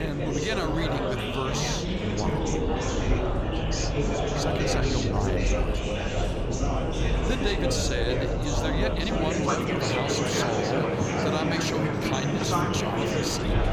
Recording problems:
train or aircraft noise; very loud; throughout; as loud as the speech
chatter from many people; very loud; throughout; 2 dB above the speech
abrupt cut into speech; at the start

